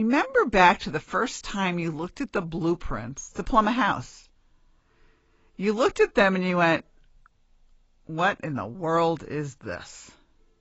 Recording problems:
garbled, watery; badly; nothing above 7.5 kHz
abrupt cut into speech; at the start

